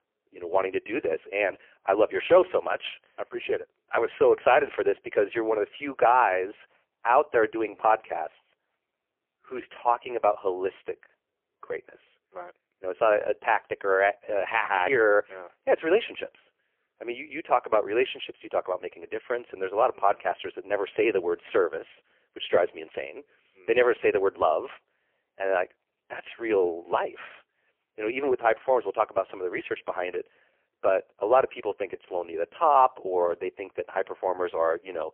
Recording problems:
phone-call audio; poor line; nothing above 3 kHz

